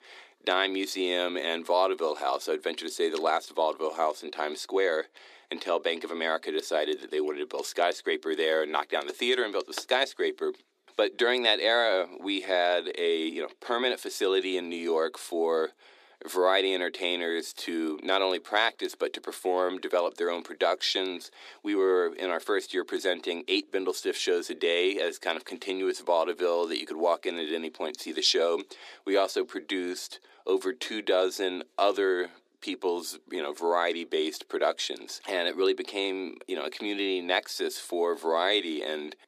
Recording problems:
thin; somewhat; fading below 300 Hz

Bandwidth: 14.5 kHz